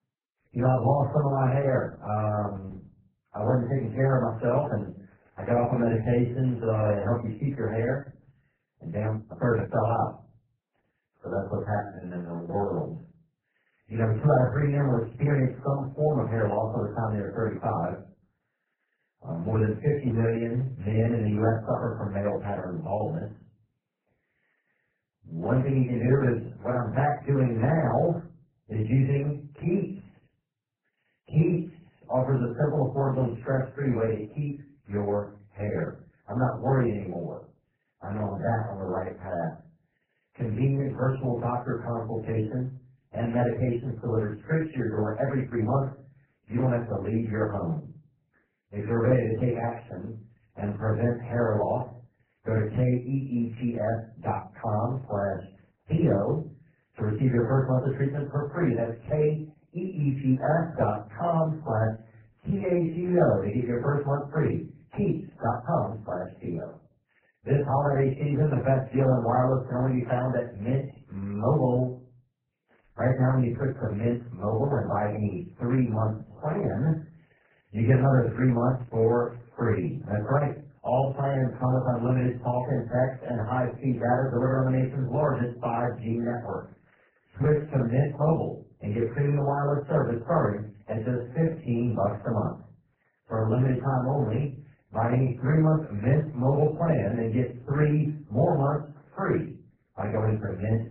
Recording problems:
off-mic speech; far
garbled, watery; badly; nothing above 4 kHz
room echo; slight; dies away in 0.3 s
muffled; very slightly; fading above 2 kHz
uneven, jittery; strongly; from 8.5 s to 1:32

